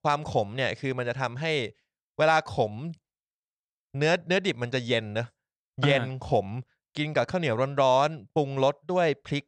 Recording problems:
none

